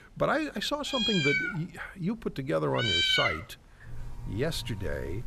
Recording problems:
animal sounds; very loud; throughout; 4 dB above the speech

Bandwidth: 14.5 kHz